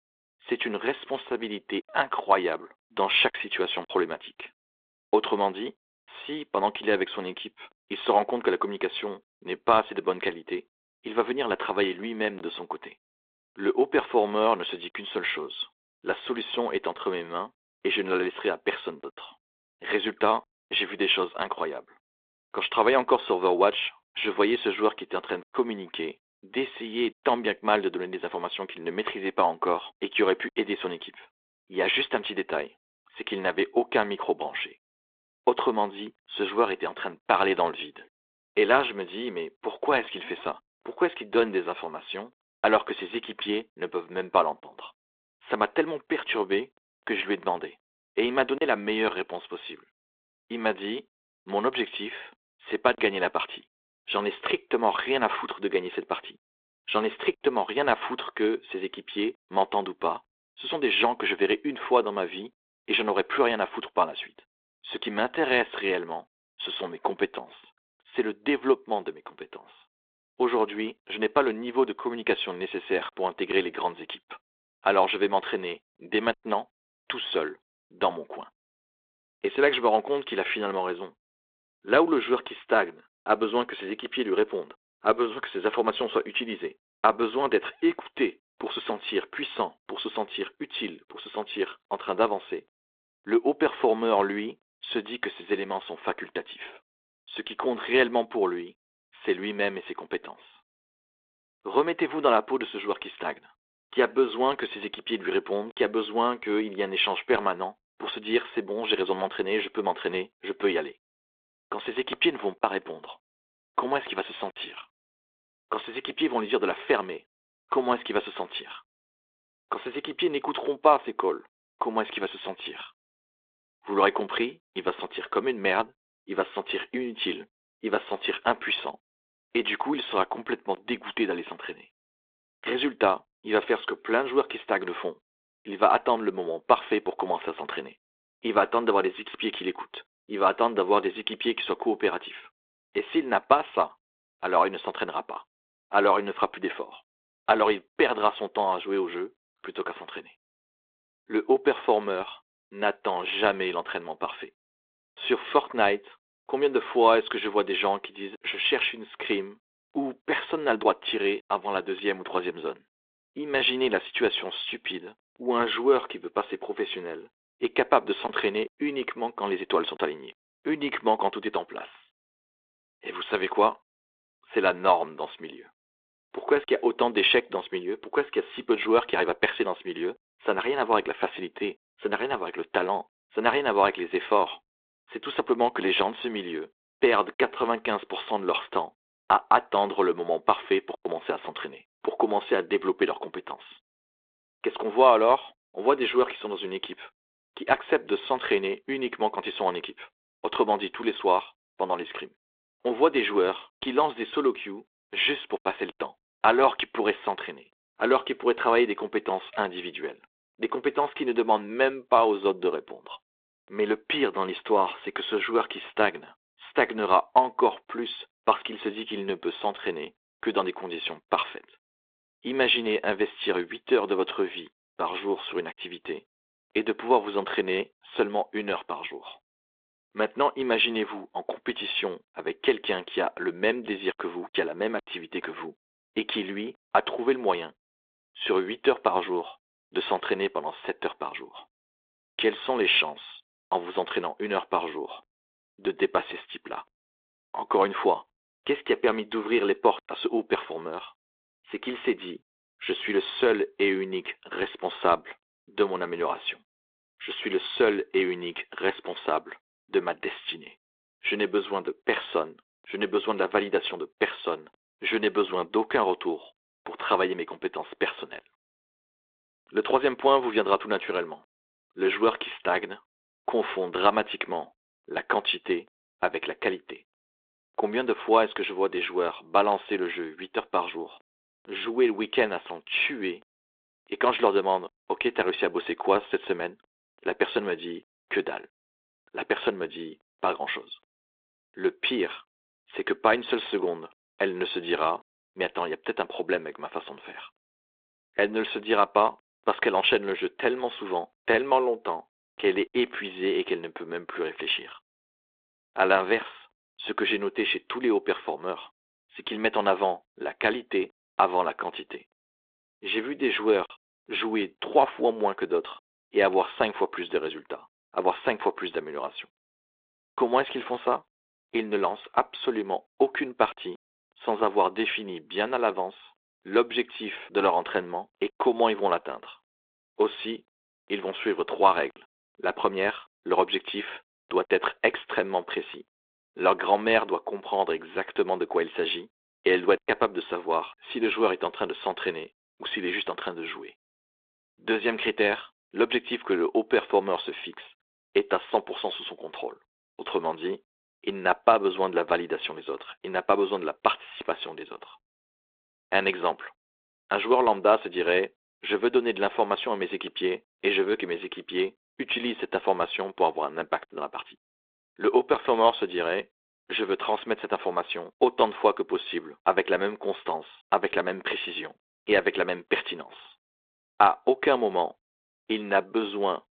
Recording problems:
phone-call audio; nothing above 3.5 kHz

